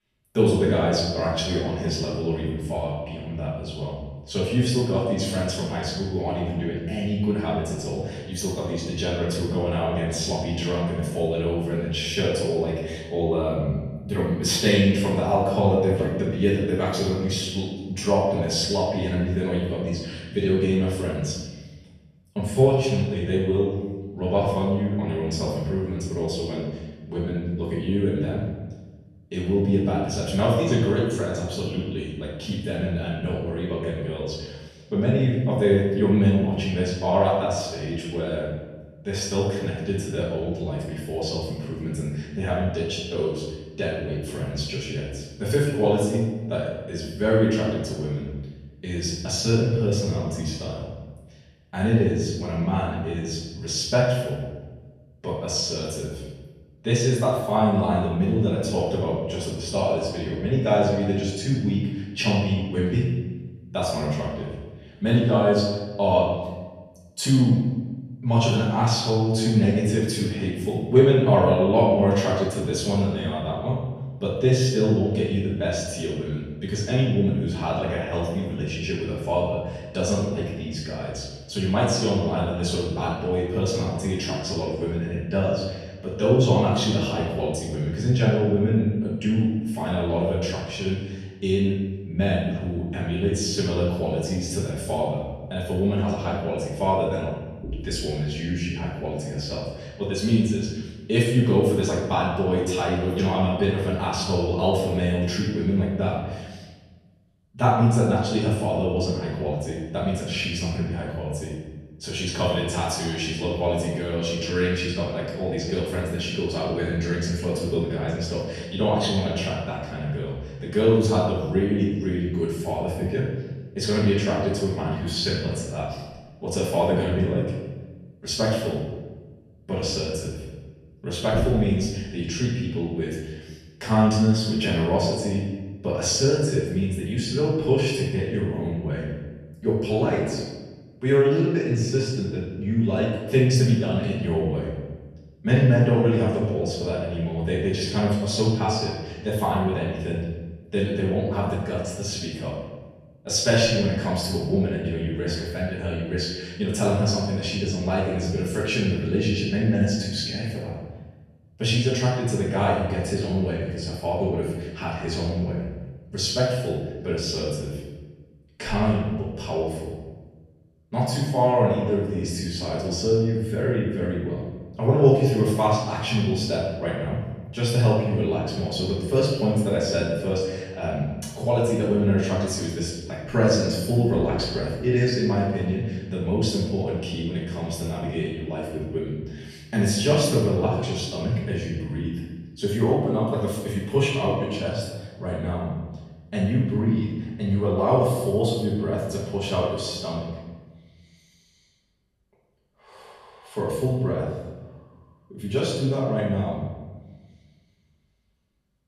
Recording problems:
off-mic speech; far
room echo; noticeable; dies away in 1.1 s

